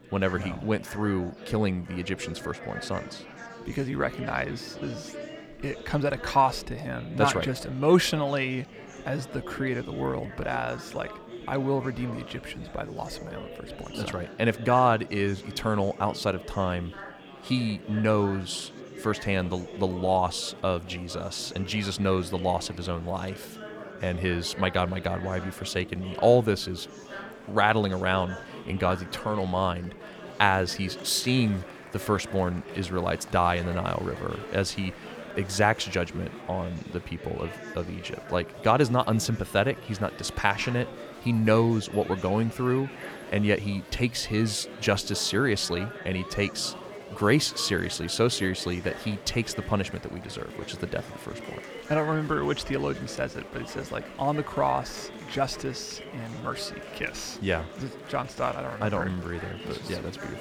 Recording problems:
murmuring crowd; noticeable; throughout; 15 dB below the speech

